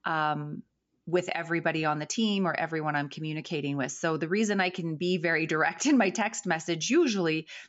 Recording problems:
high frequencies cut off; noticeable; nothing above 8 kHz

